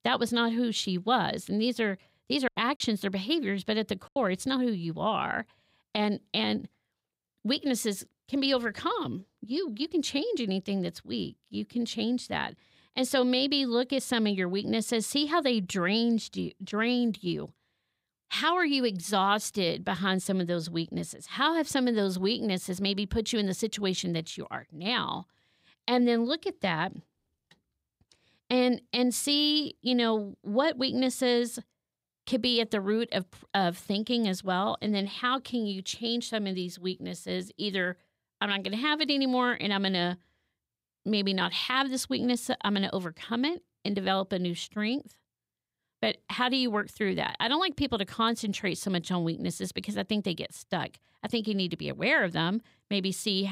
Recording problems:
choppy; occasionally; from 2.5 to 4 s; 3% of the speech affected
abrupt cut into speech; at the end

